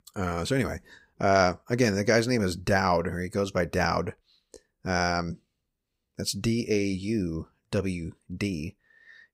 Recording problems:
none

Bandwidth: 15.5 kHz